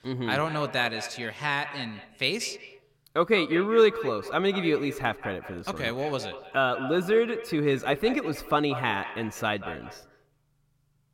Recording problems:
echo of what is said; noticeable; throughout; 180 ms later, 10 dB below the speech

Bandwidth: 16.5 kHz